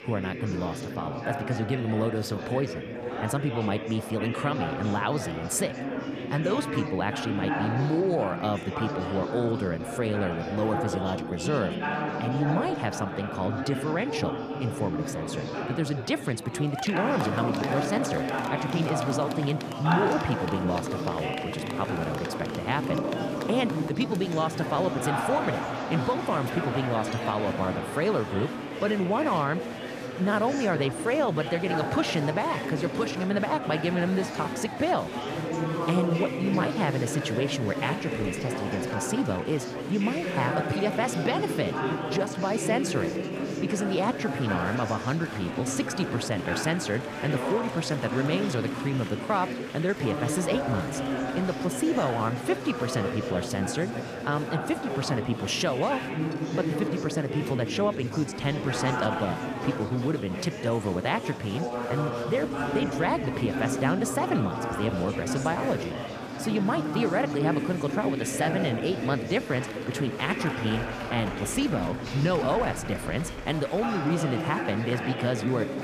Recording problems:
chatter from many people; loud; throughout; 3 dB below the speech

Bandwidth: 14.5 kHz